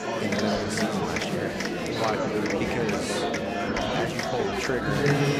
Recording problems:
murmuring crowd; very loud; throughout; 5 dB above the speech

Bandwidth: 15 kHz